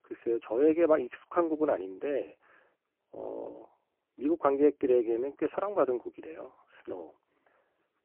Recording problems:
phone-call audio; poor line

